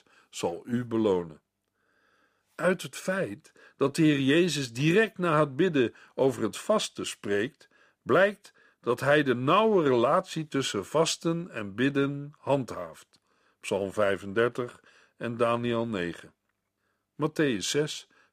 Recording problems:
none

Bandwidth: 15 kHz